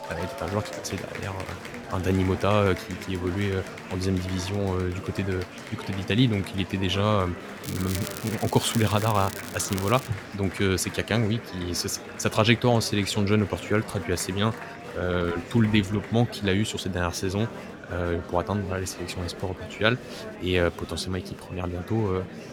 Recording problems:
murmuring crowd; noticeable; throughout; 10 dB below the speech
crackling; noticeable; from 7.5 to 10 s; 10 dB below the speech

